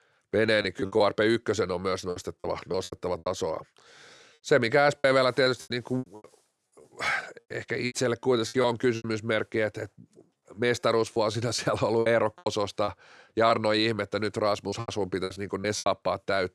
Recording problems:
choppy; very; 11% of the speech affected

